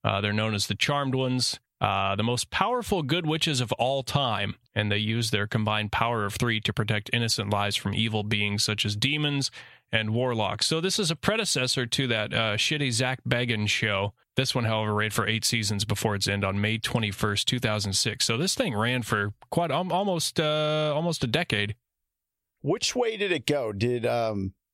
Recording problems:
squashed, flat; somewhat

